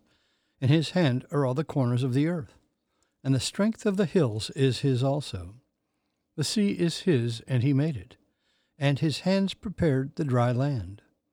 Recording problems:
none

